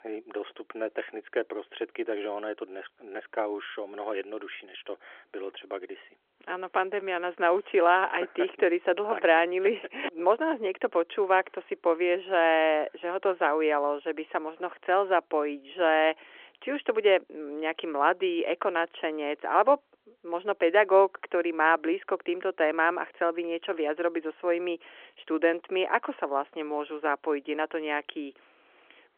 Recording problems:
phone-call audio

